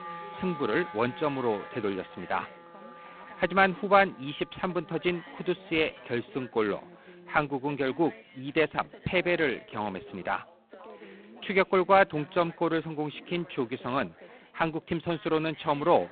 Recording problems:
phone-call audio; poor line; nothing above 4 kHz
background music; noticeable; throughout; 20 dB below the speech
background chatter; faint; throughout; 4 voices, 20 dB below the speech

